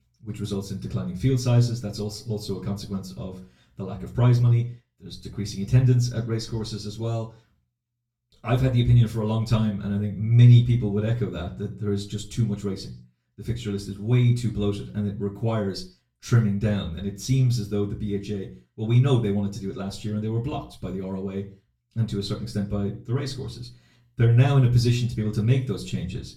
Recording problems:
off-mic speech; far
room echo; very slight; dies away in 0.3 s

